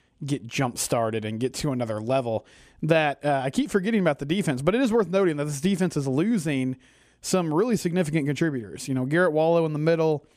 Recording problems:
none

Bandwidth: 14.5 kHz